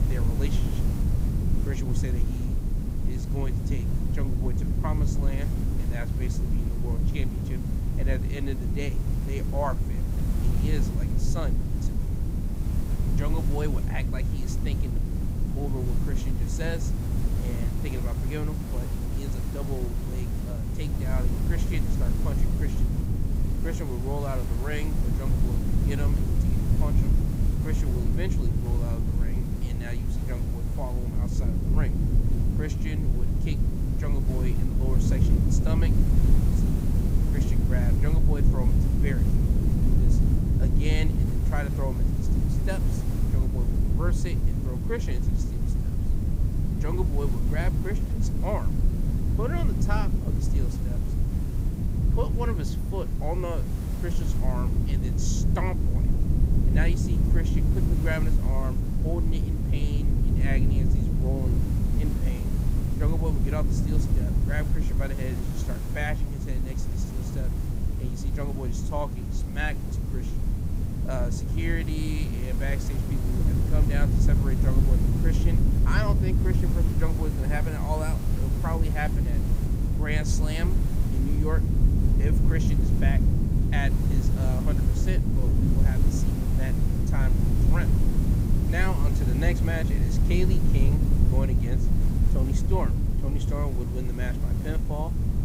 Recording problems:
hiss; loud; throughout; 8 dB below the speech
low rumble; loud; throughout; 2 dB below the speech

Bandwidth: 15.5 kHz